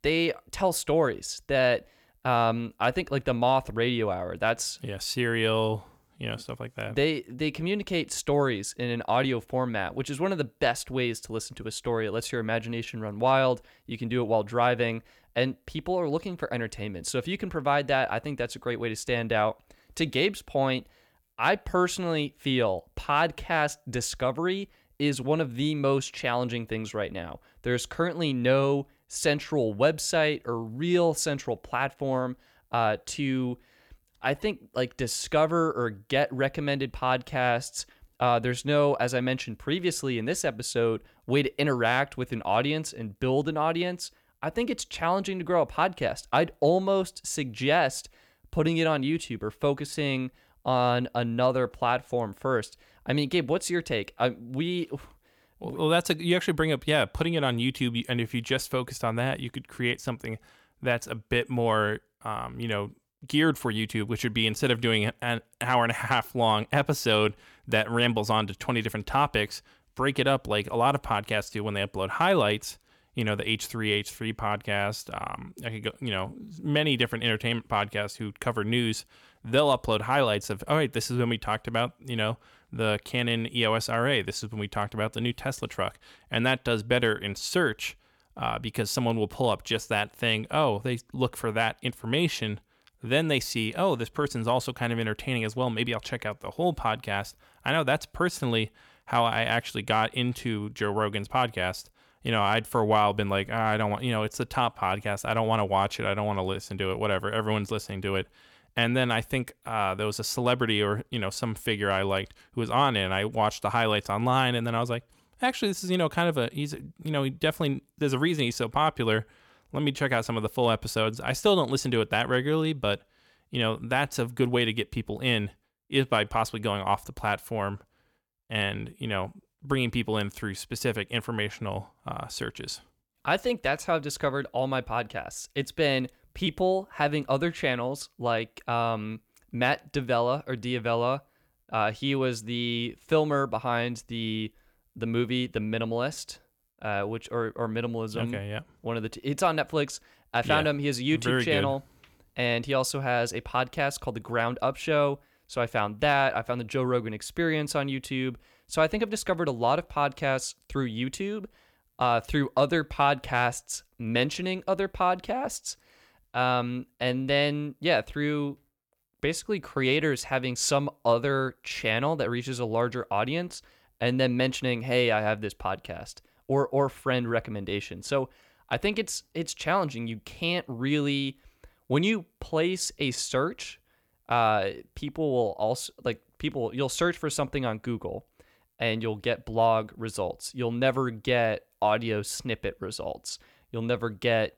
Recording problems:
none

